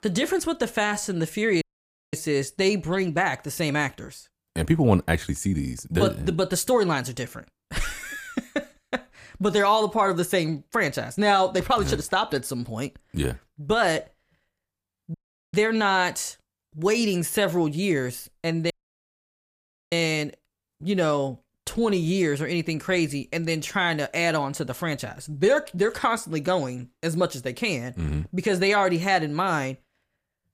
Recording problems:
audio cutting out; at 1.5 s for 0.5 s, at 15 s and at 19 s for 1 s

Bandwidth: 15 kHz